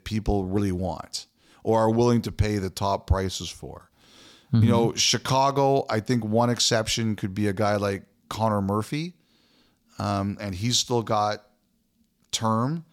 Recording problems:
none

